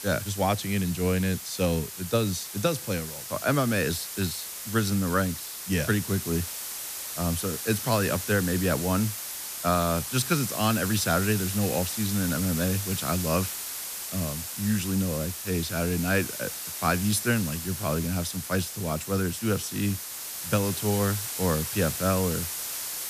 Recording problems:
hiss; loud; throughout; 5 dB below the speech

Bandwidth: 14.5 kHz